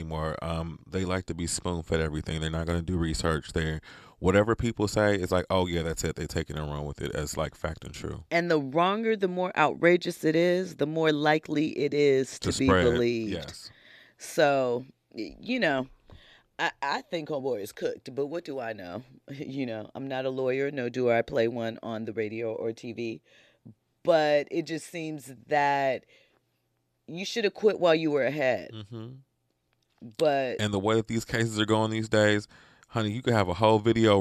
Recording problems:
abrupt cut into speech; at the start and the end

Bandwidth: 14 kHz